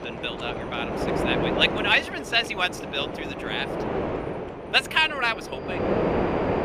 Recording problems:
thin; somewhat; fading below 900 Hz
wind noise on the microphone; heavy; 6 dB below the speech
animal sounds; faint; throughout; 30 dB below the speech

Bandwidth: 15 kHz